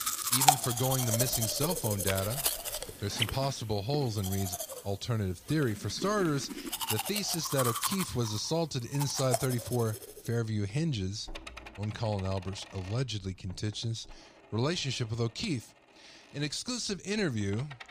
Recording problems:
household noises; very loud; throughout; 1 dB above the speech

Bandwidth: 15 kHz